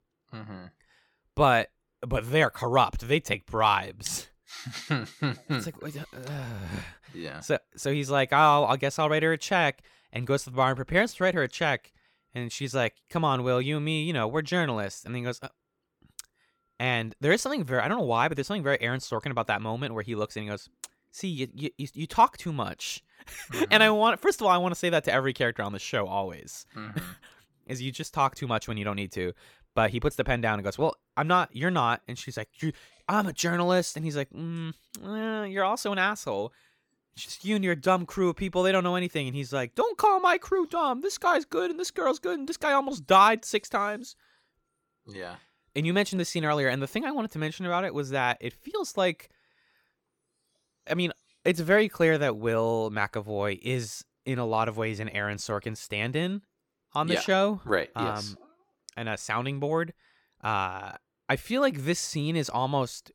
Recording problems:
none

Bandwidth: 17.5 kHz